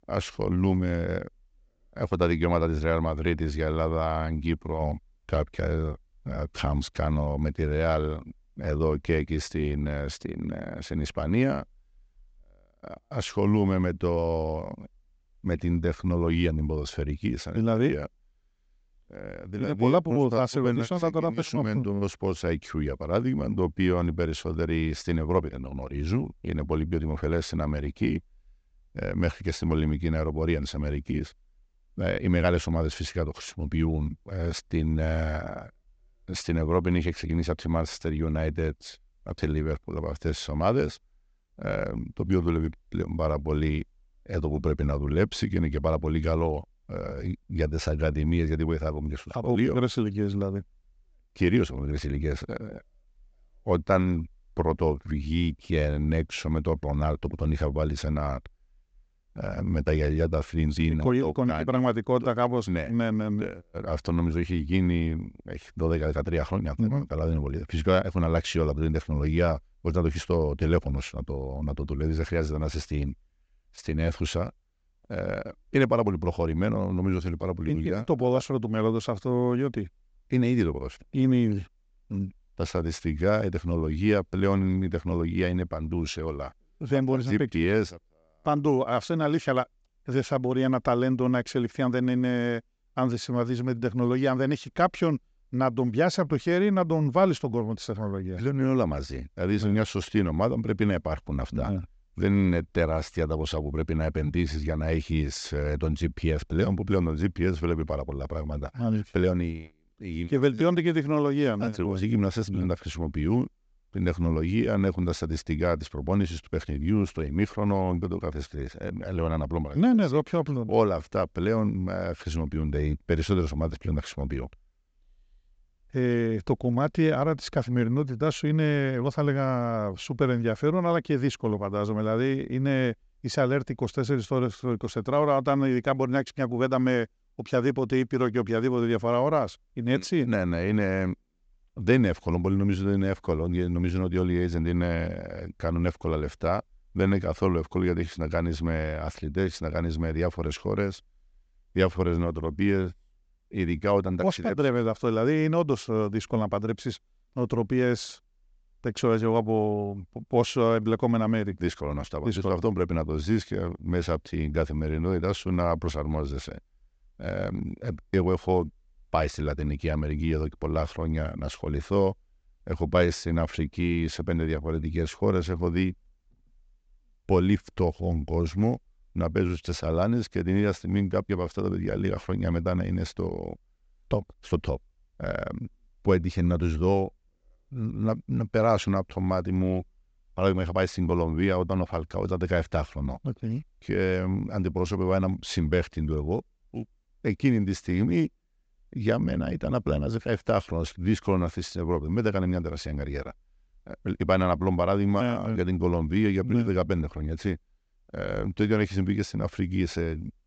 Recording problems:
high frequencies cut off; noticeable; nothing above 8 kHz

